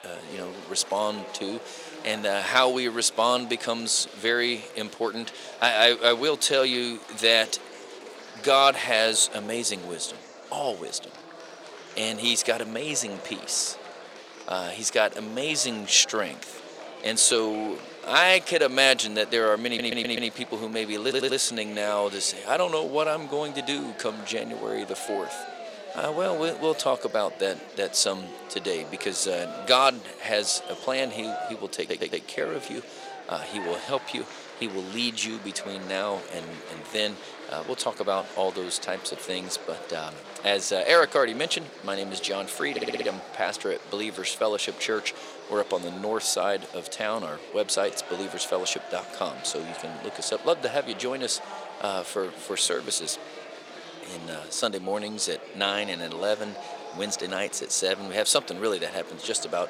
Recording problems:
thin; somewhat; fading below 500 Hz
murmuring crowd; noticeable; throughout; 15 dB below the speech
audio stuttering; 4 times, first at 20 s

